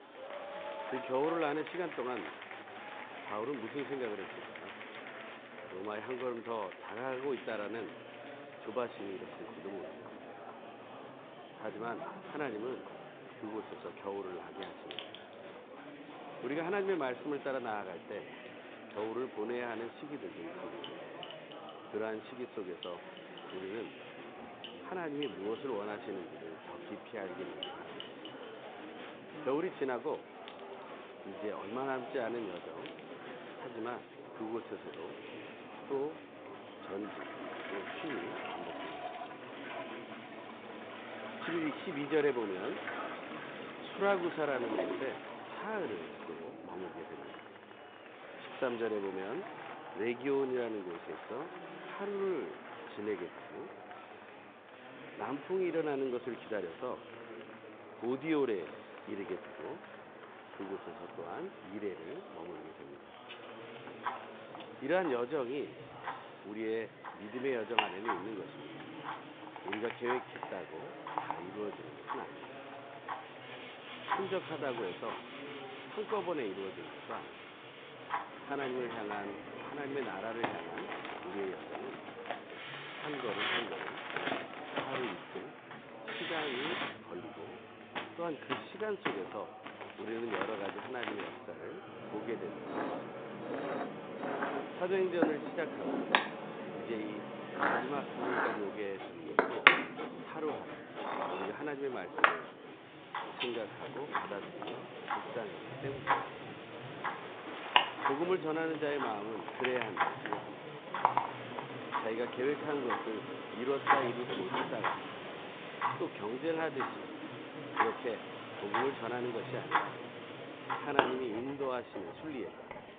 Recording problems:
phone-call audio; nothing above 3.5 kHz
household noises; very loud; throughout; 1 dB above the speech
machinery noise; loud; from 1:13 on; 7 dB below the speech
murmuring crowd; loud; throughout; 9 dB below the speech
traffic noise; noticeable; throughout; 20 dB below the speech

